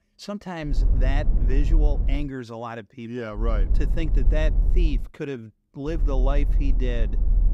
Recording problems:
low rumble; noticeable; from 0.5 to 2 s, from 3.5 to 5 s and from 6 s on; 10 dB below the speech

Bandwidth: 15.5 kHz